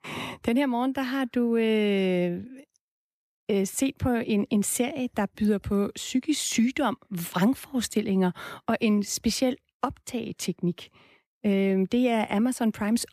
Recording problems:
none

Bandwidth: 14.5 kHz